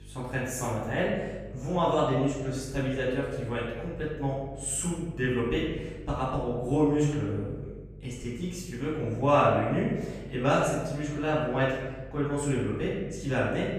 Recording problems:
off-mic speech; far
room echo; noticeable; dies away in 1.1 s
electrical hum; faint; throughout; 50 Hz, 30 dB below the speech

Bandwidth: 15 kHz